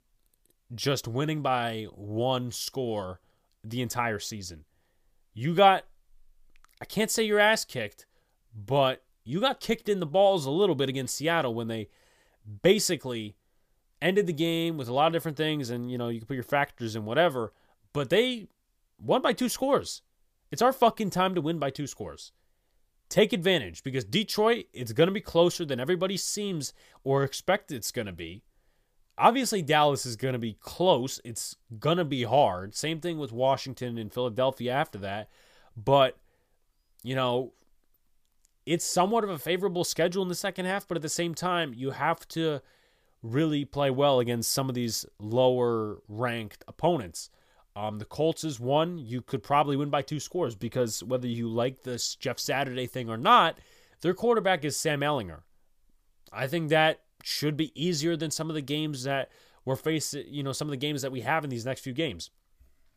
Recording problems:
none

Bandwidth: 15 kHz